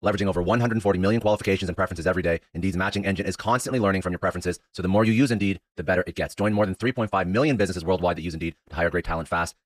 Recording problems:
wrong speed, natural pitch; too fast; 1.5 times normal speed

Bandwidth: 14.5 kHz